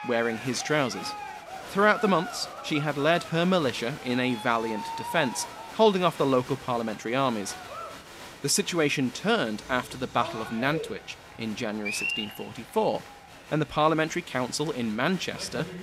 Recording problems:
crowd noise; noticeable; throughout; 10 dB below the speech

